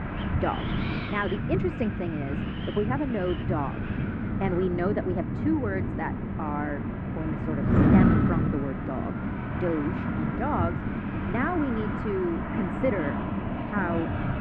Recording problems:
muffled; very; fading above 2 kHz
wind noise on the microphone; heavy; 3 dB below the speech
train or aircraft noise; loud; throughout; 9 dB below the speech

